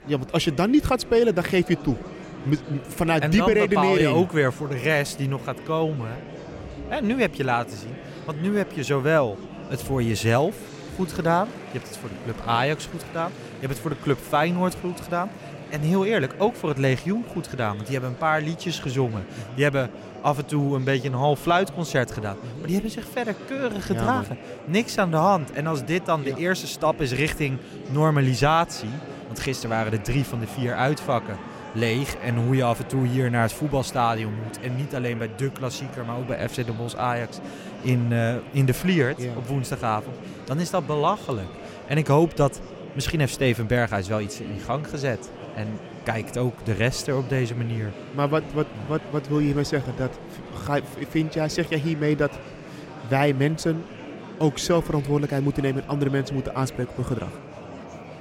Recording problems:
murmuring crowd; noticeable; throughout; 15 dB below the speech

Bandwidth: 16 kHz